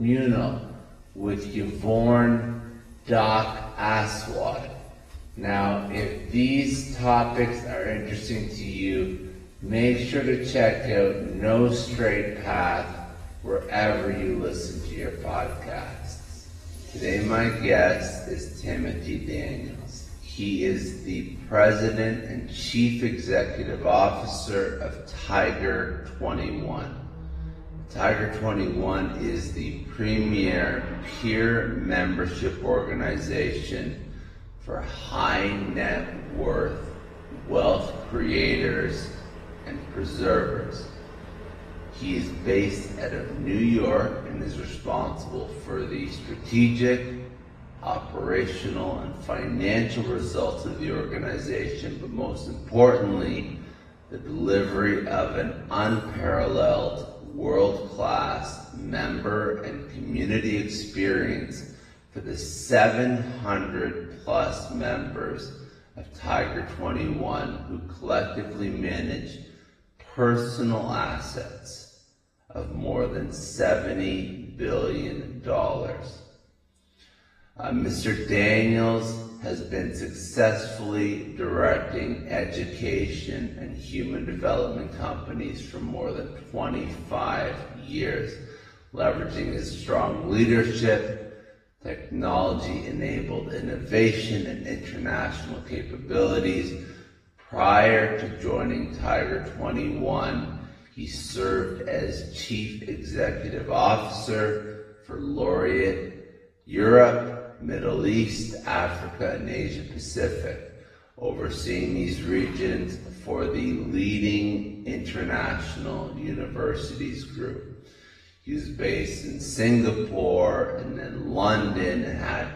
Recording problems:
off-mic speech; far
wrong speed, natural pitch; too slow; 0.6 times normal speed
room echo; noticeable; dies away in 1 s
garbled, watery; slightly; nothing above 14.5 kHz
traffic noise; noticeable; throughout; 20 dB below the speech
abrupt cut into speech; at the start

